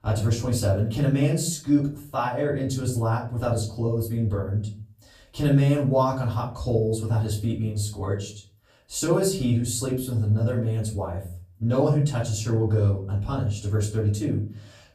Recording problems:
off-mic speech; far
room echo; slight; dies away in 0.4 s

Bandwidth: 15 kHz